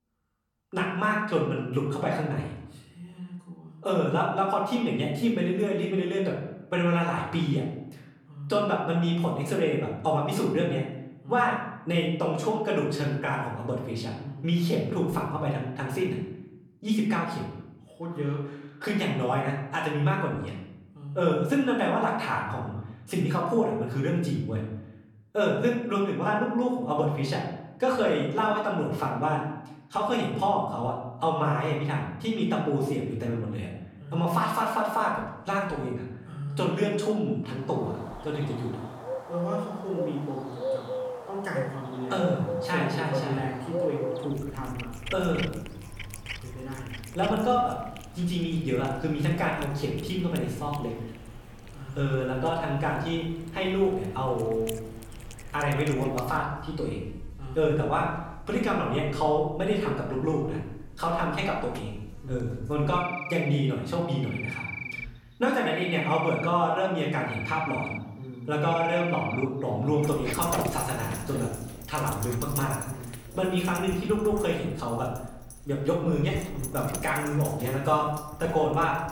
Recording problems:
off-mic speech; far
room echo; noticeable; dies away in 0.8 s
animal sounds; loud; from 38 s on; 10 dB below the speech

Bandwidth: 17.5 kHz